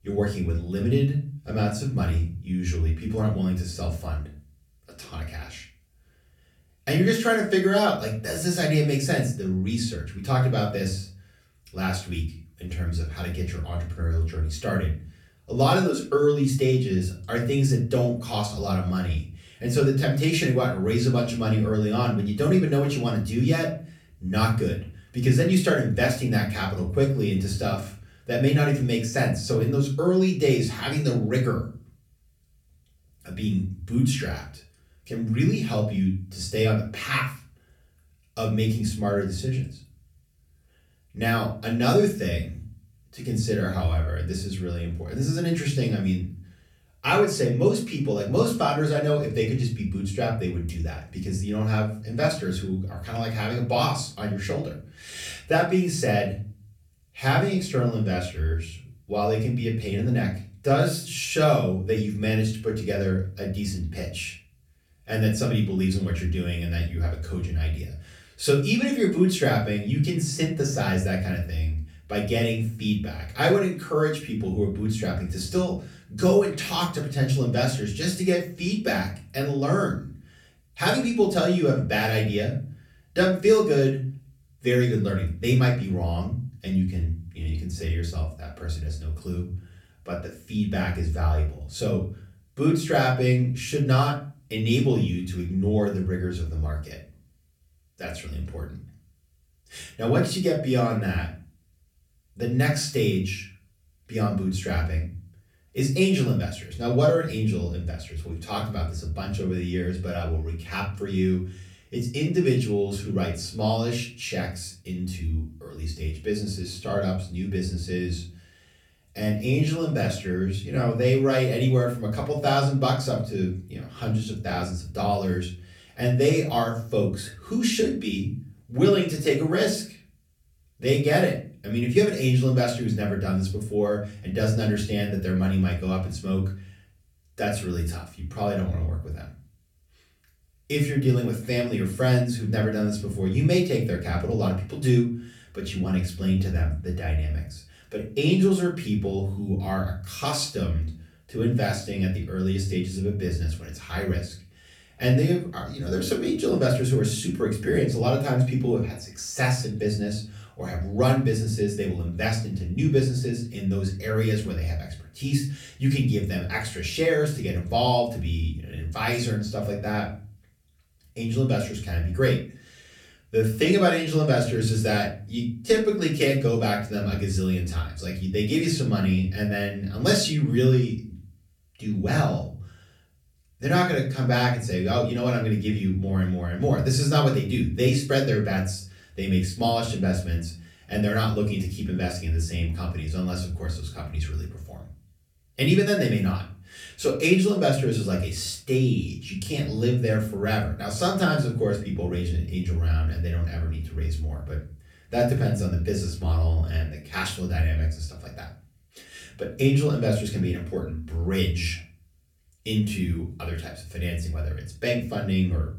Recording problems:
off-mic speech; far
room echo; slight; dies away in 0.4 s

